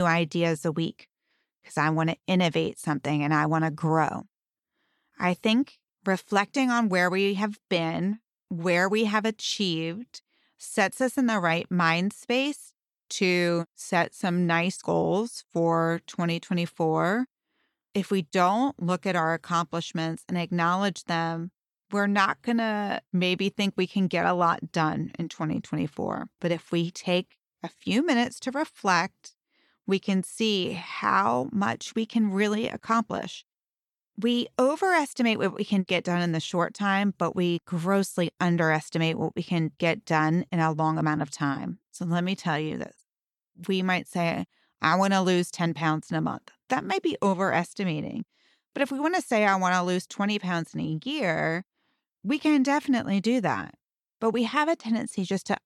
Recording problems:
abrupt cut into speech; at the start

